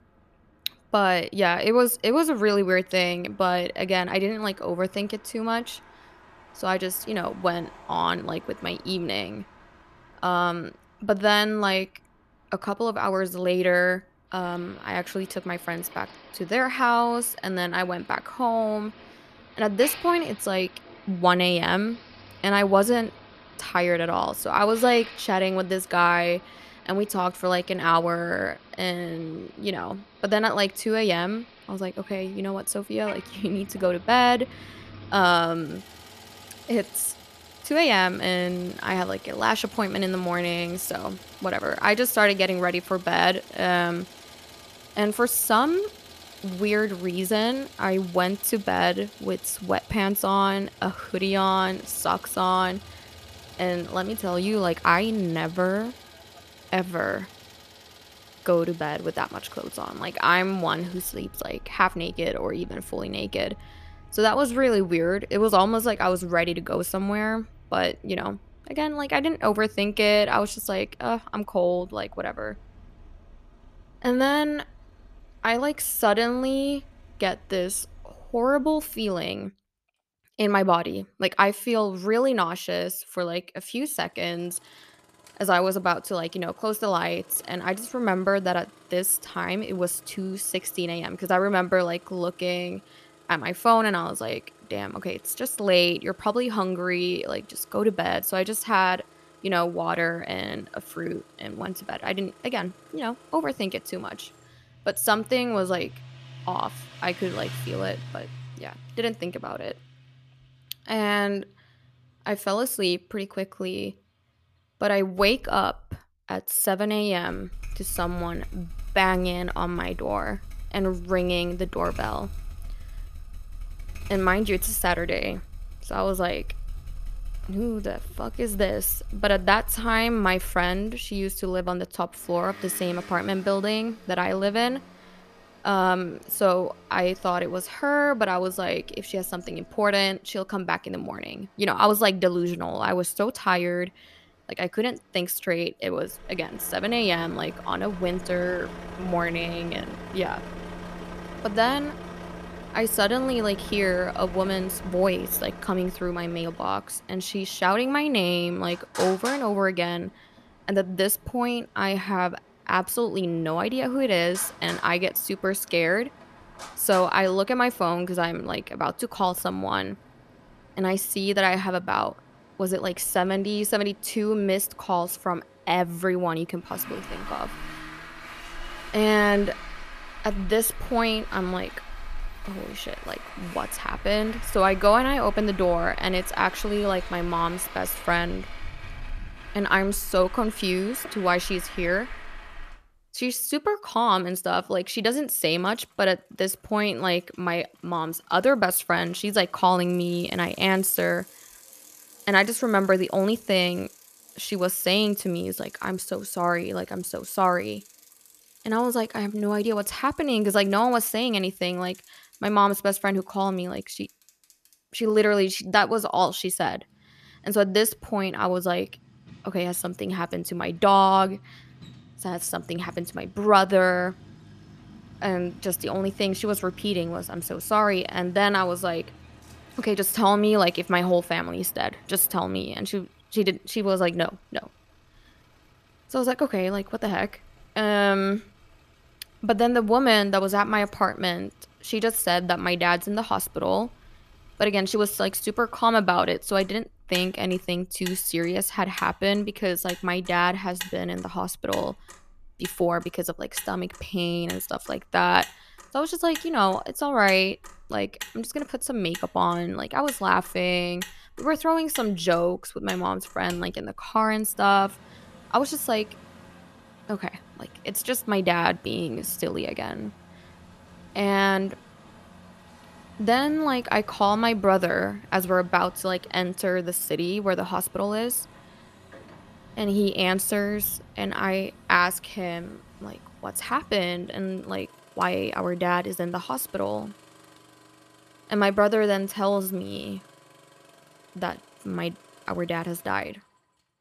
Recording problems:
traffic noise; noticeable; throughout; 20 dB below the speech

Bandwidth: 14.5 kHz